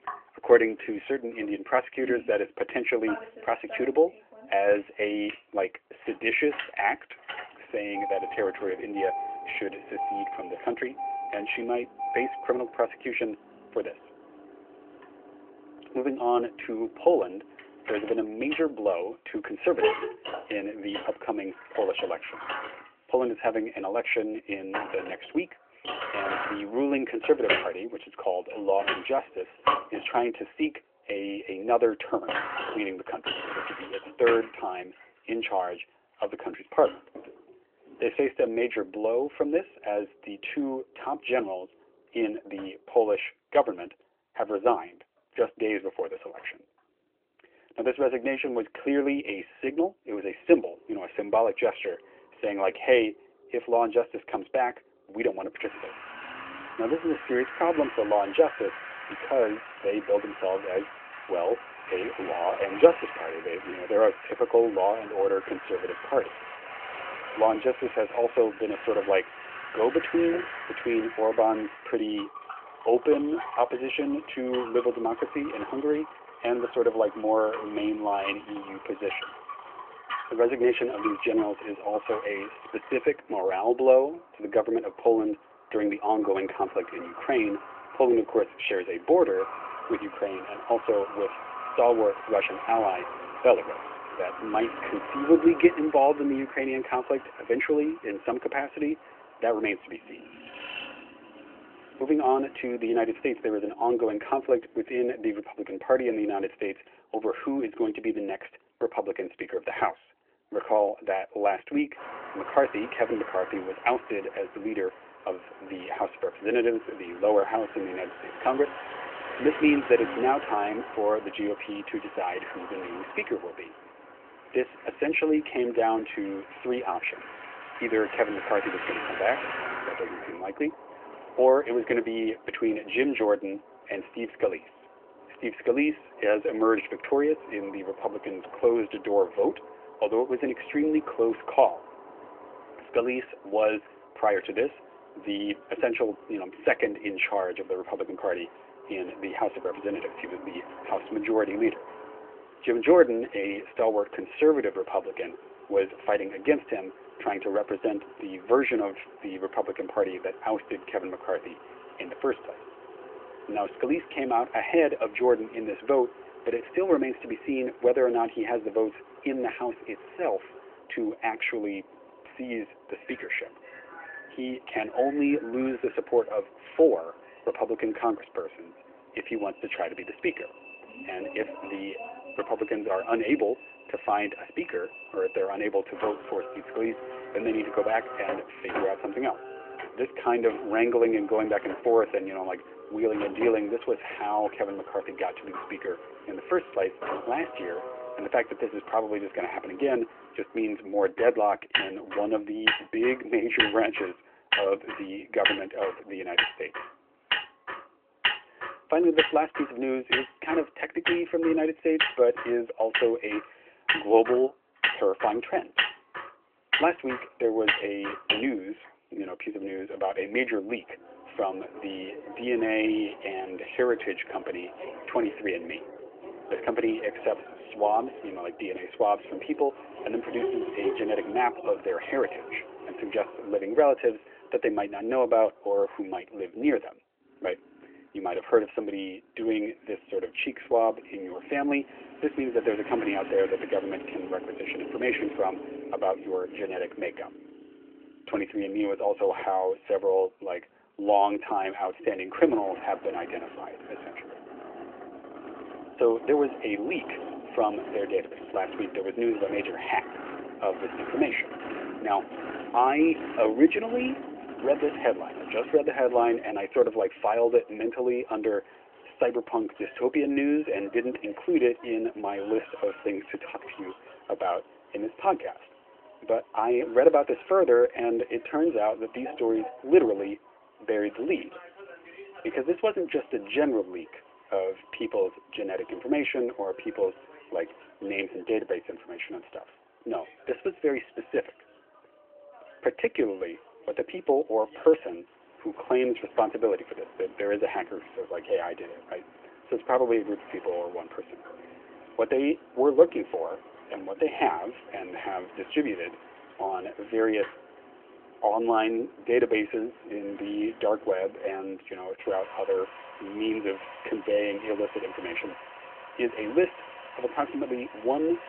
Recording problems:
phone-call audio
traffic noise; loud; throughout; 9 dB below the speech

